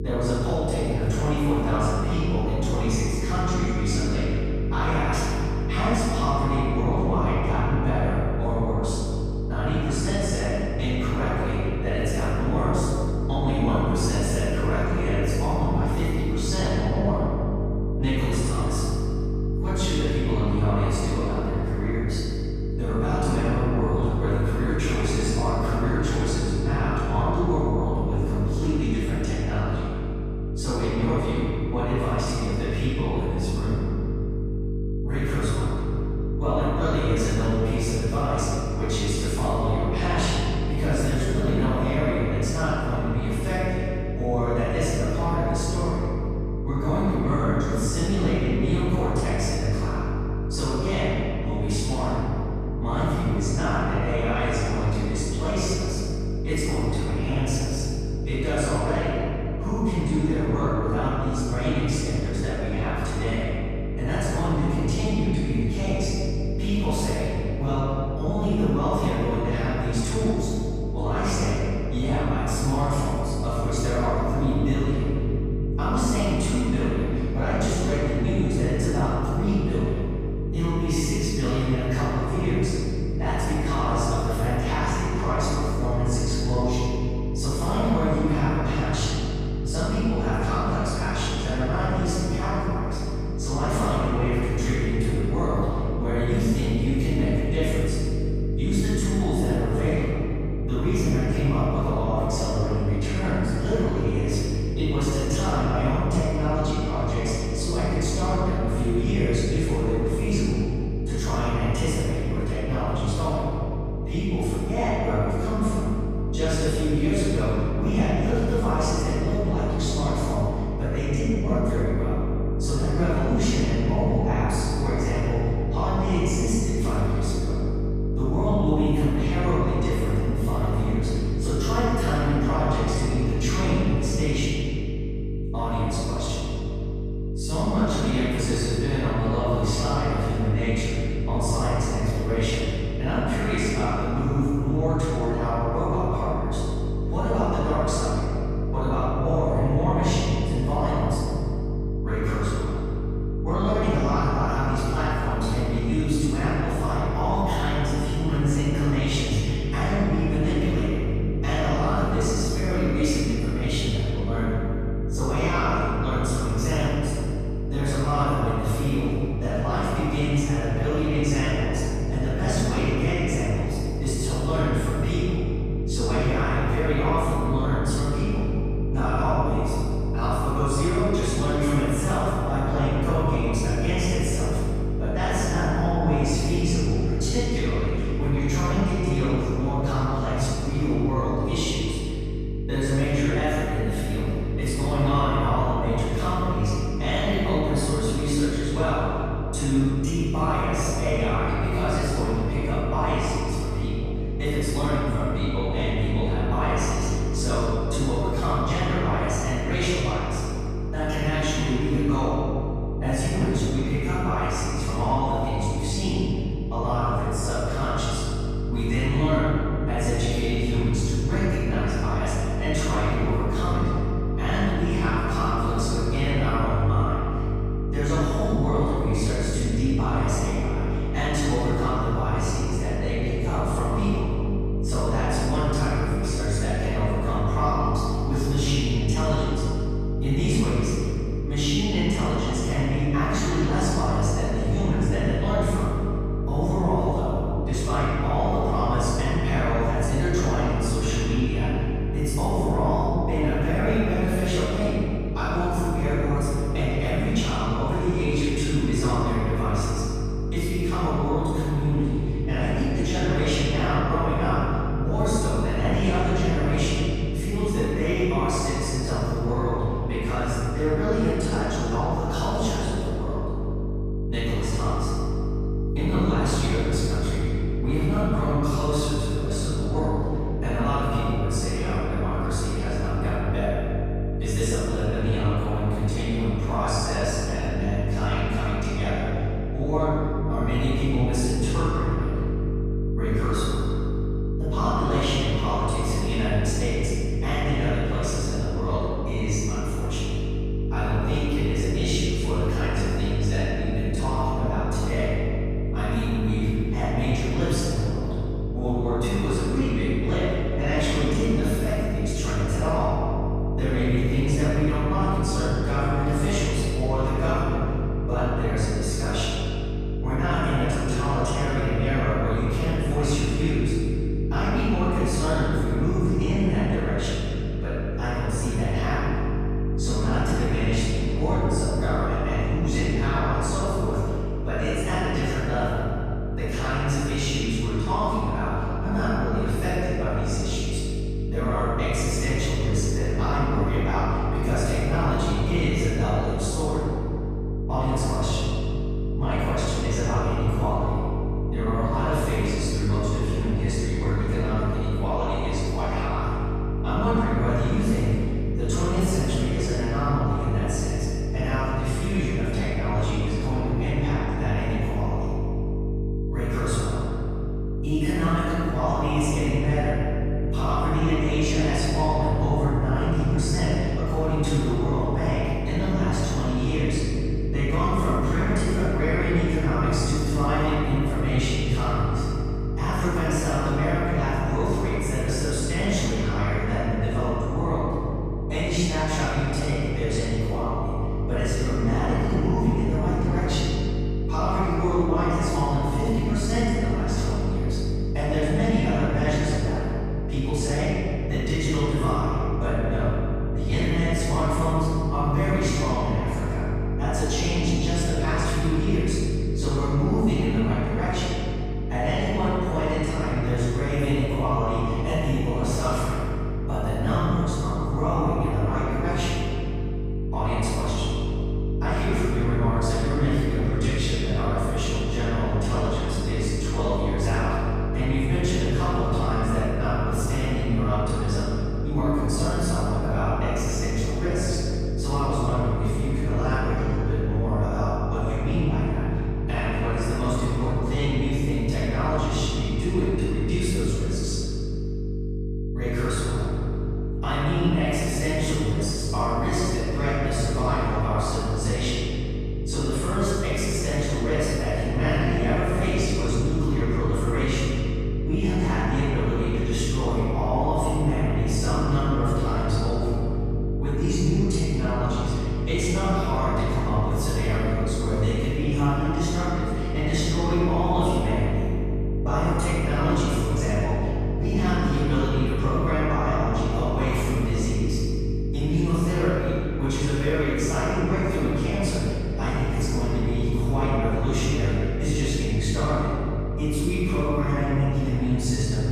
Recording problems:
room echo; strong; dies away in 2.5 s
off-mic speech; far
electrical hum; loud; throughout; 50 Hz, 8 dB below the speech

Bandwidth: 14.5 kHz